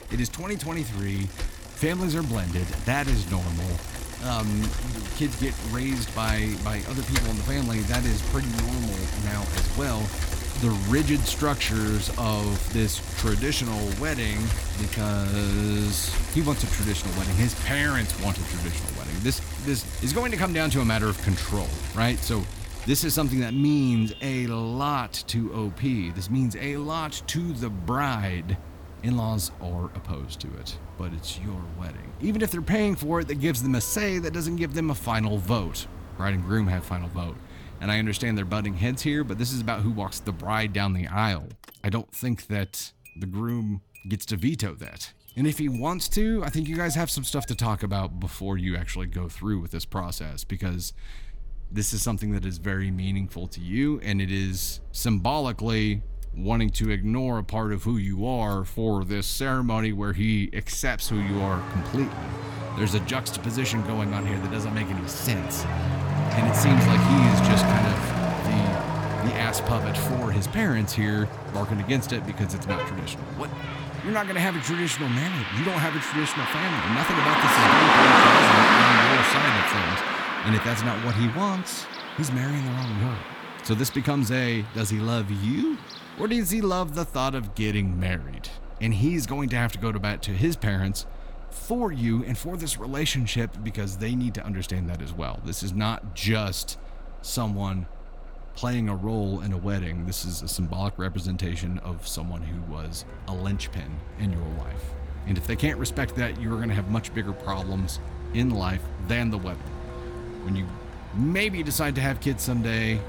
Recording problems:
traffic noise; very loud; throughout; 1 dB above the speech

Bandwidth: 18.5 kHz